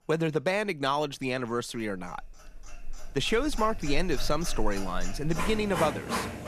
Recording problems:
household noises; loud; throughout; 7 dB below the speech

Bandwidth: 14 kHz